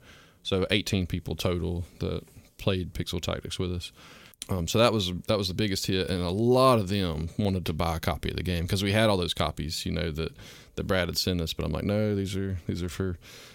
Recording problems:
none

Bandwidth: 16.5 kHz